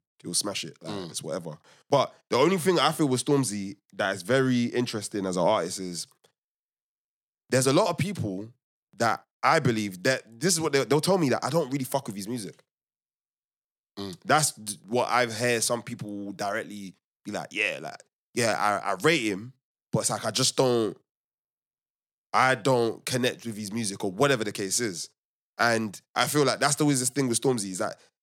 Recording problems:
none

